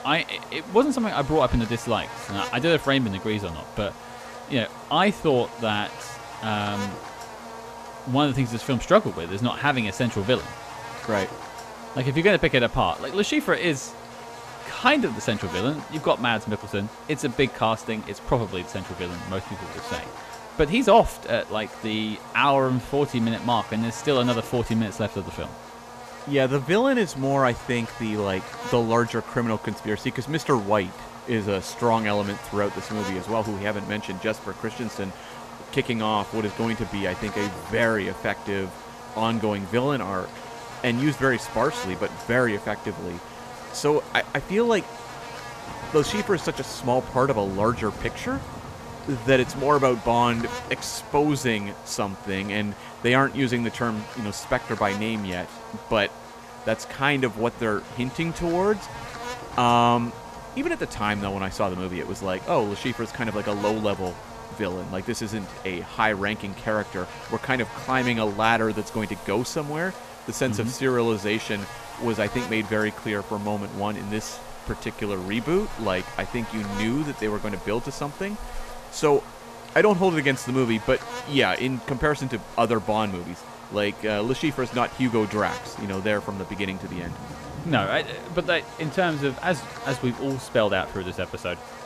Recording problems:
electrical hum; noticeable; throughout; 50 Hz, 10 dB below the speech
rain or running water; faint; from 34 s on; 20 dB below the speech

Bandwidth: 14.5 kHz